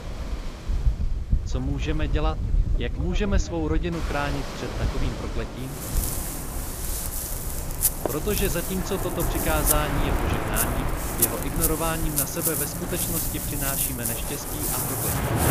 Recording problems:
rain or running water; very loud; throughout; 4 dB above the speech

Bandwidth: 15 kHz